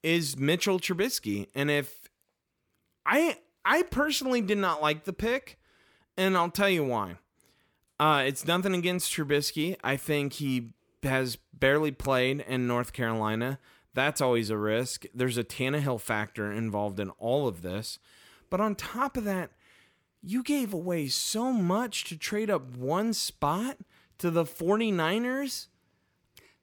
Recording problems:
none

